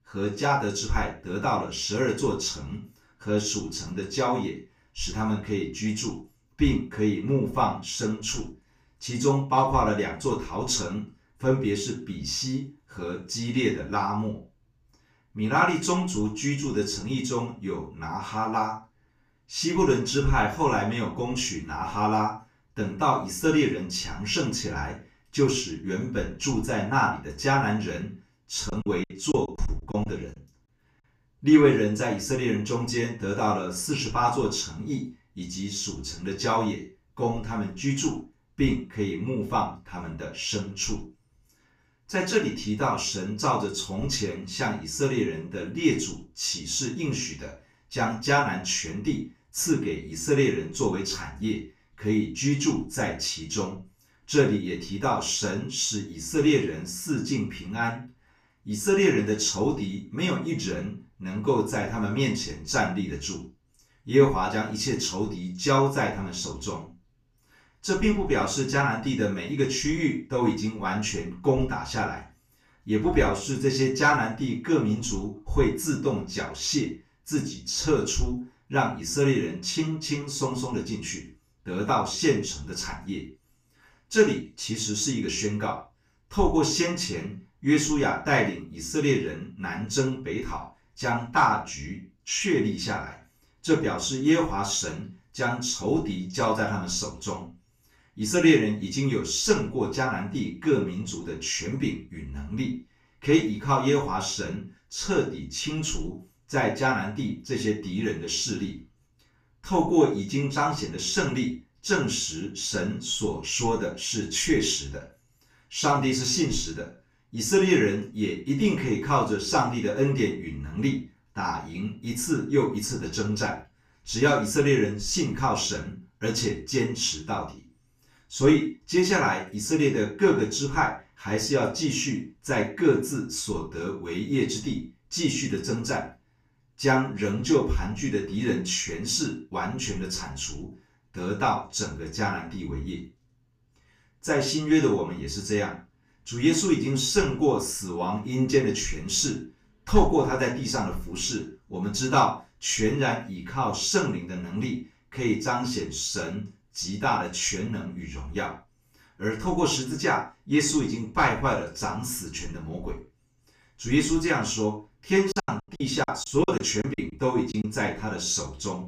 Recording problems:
off-mic speech; far
room echo; noticeable; dies away in 0.3 s
choppy; very; from 29 to 30 s and from 2:45 to 2:48; 16% of the speech affected

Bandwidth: 15 kHz